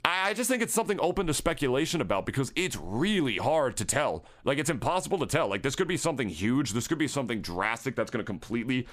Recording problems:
squashed, flat; somewhat

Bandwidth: 15 kHz